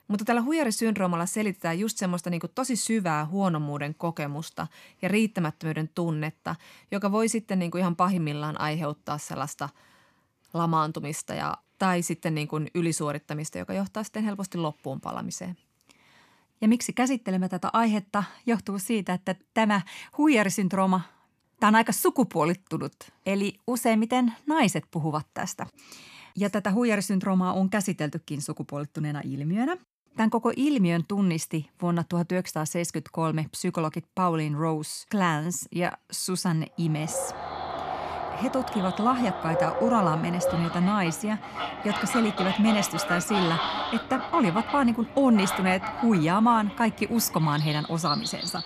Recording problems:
animal sounds; loud; from 37 s on; 5 dB below the speech

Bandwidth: 14.5 kHz